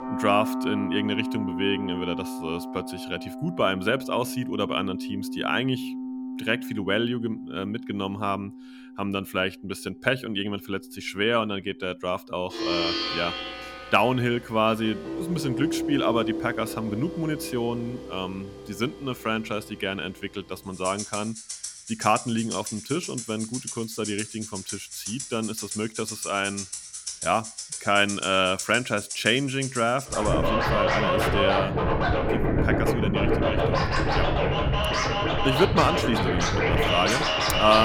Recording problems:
background music; loud; throughout; 1 dB below the speech
abrupt cut into speech; at the end

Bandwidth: 17 kHz